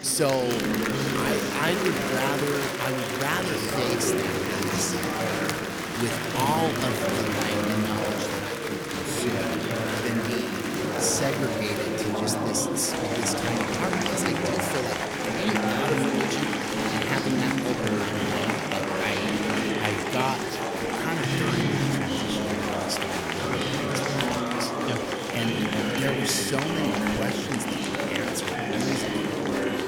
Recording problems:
chatter from many people; very loud; throughout; 4 dB above the speech

